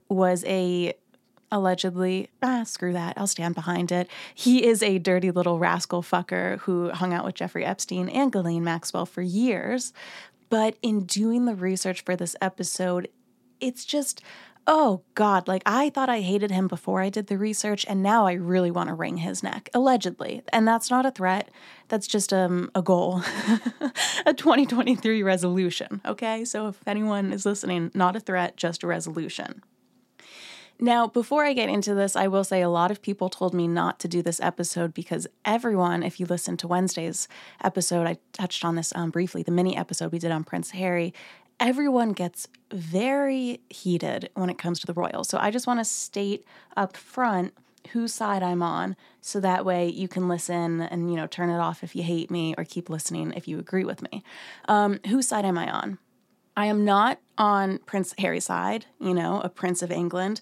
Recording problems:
uneven, jittery; strongly; from 2 to 58 s

